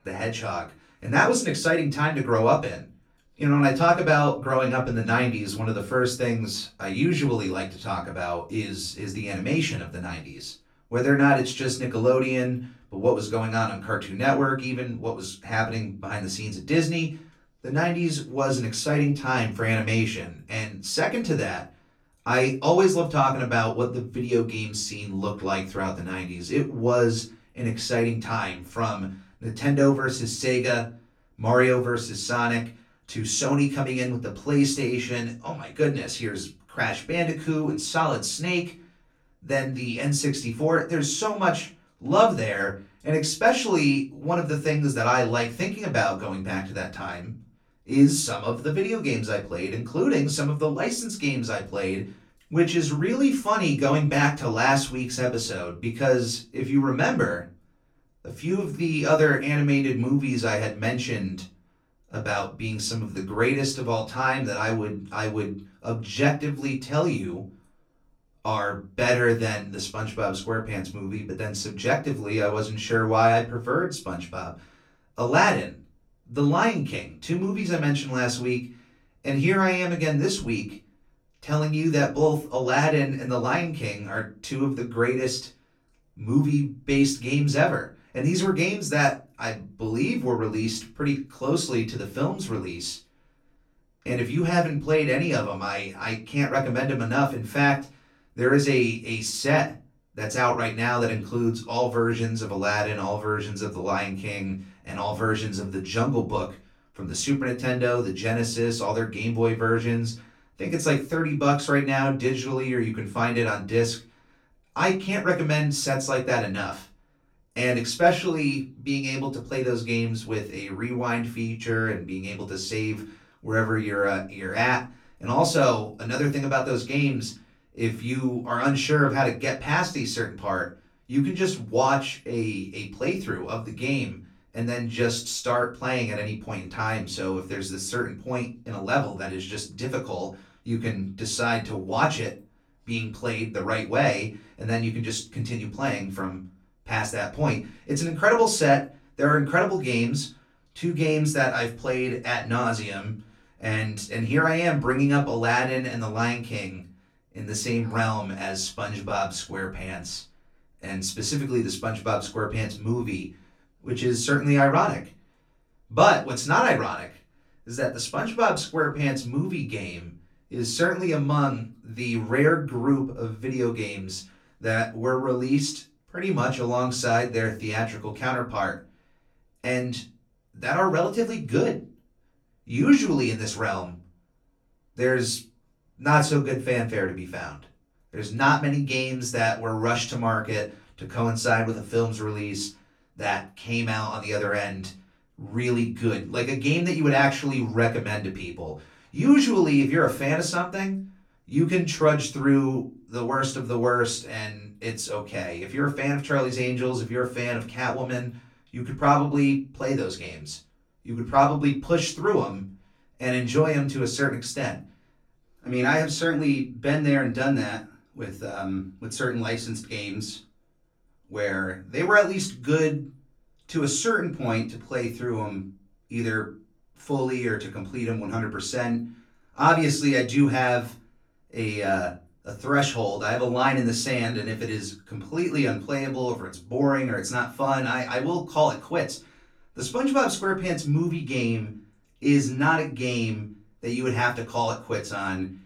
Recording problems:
off-mic speech; far
room echo; very slight; dies away in 0.3 s

